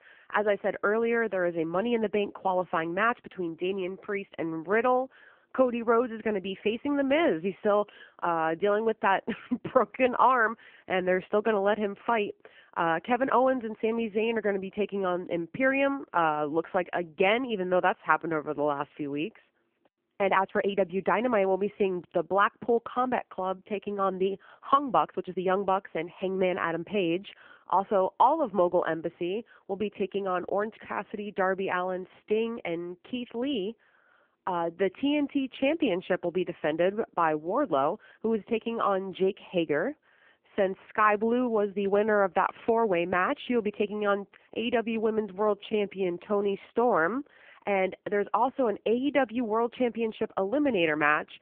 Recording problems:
phone-call audio; poor line; nothing above 3 kHz
uneven, jittery; strongly; from 20 to 47 s

